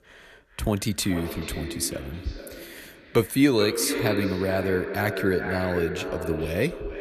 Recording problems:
echo of what is said; strong; throughout; 430 ms later, 6 dB below the speech

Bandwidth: 14 kHz